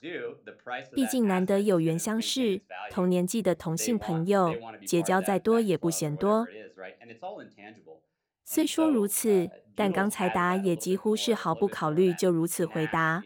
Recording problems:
voice in the background; noticeable; throughout; 15 dB below the speech

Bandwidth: 17 kHz